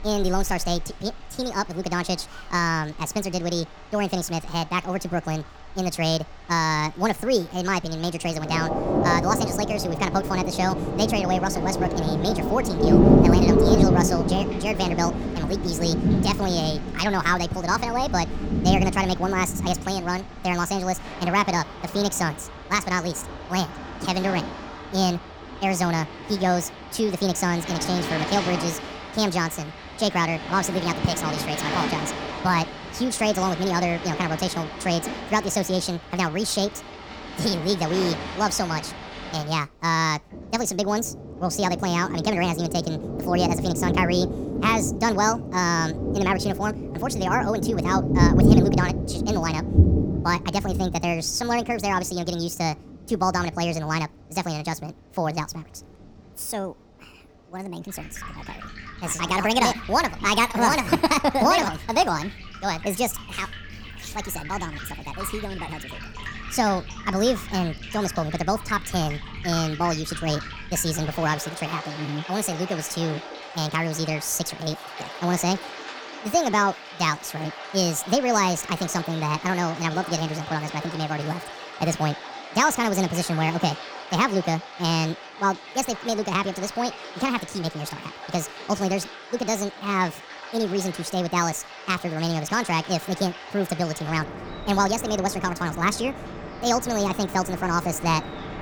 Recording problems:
wrong speed and pitch; too fast and too high; 1.6 times normal speed
rain or running water; loud; throughout; 4 dB below the speech

